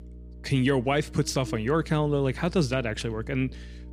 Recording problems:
electrical hum; faint; throughout; 60 Hz, 20 dB below the speech

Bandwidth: 14.5 kHz